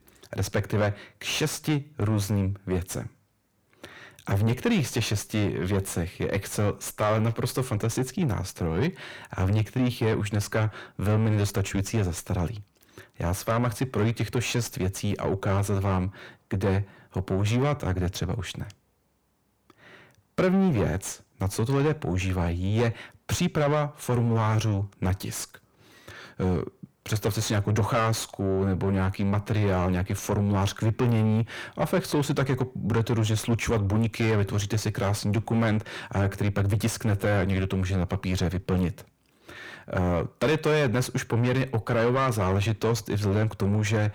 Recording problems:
distortion; heavy; 6 dB below the speech

